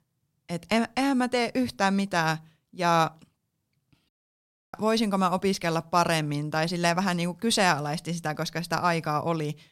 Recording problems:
audio cutting out; at 4 s for 0.5 s

